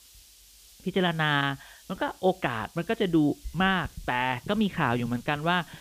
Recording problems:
high frequencies cut off; severe; nothing above 4 kHz
hiss; faint; throughout; 25 dB below the speech

